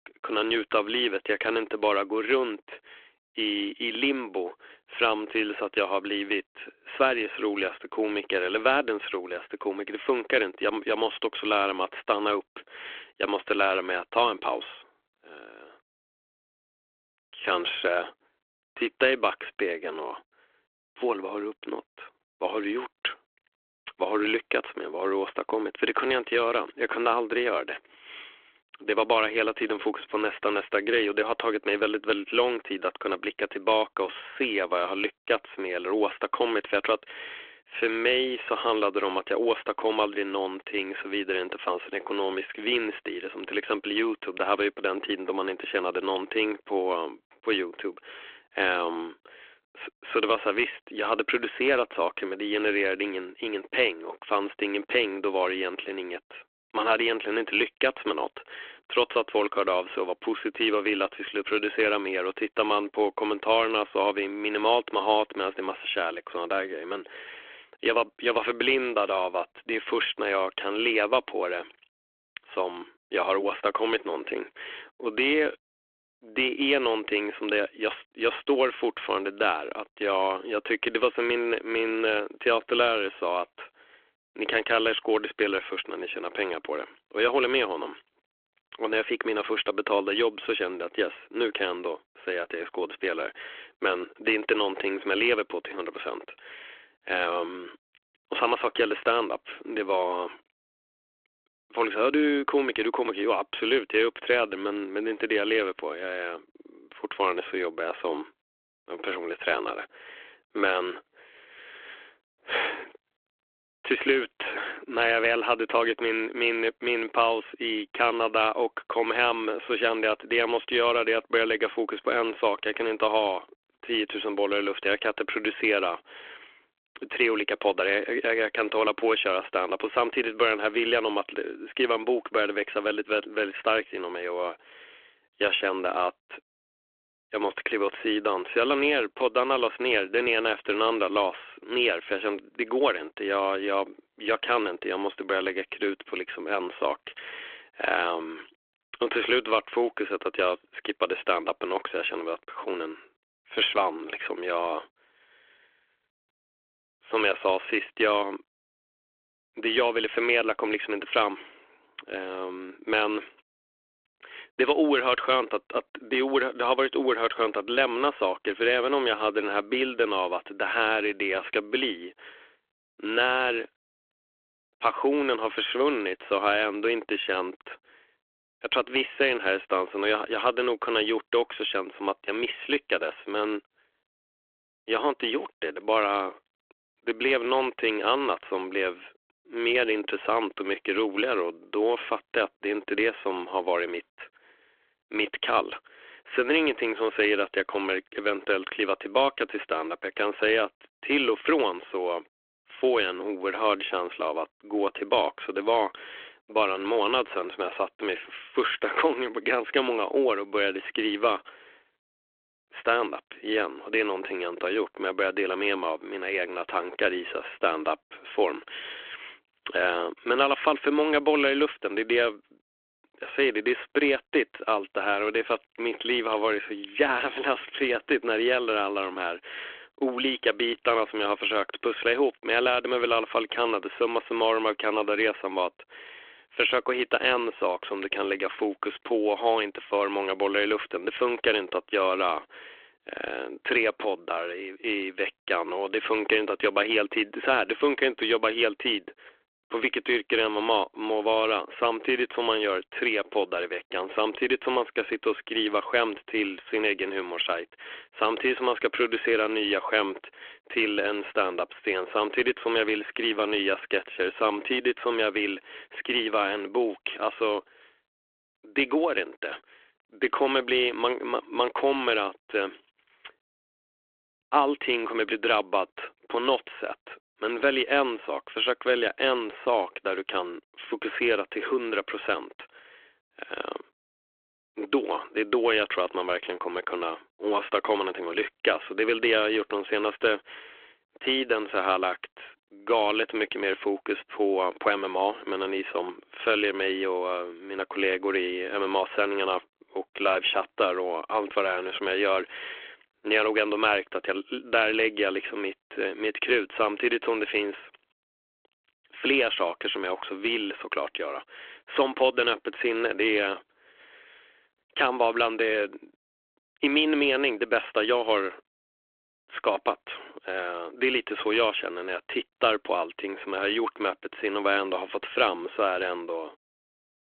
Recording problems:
phone-call audio

